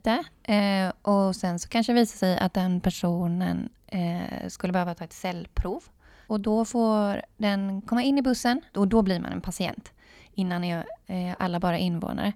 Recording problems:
none

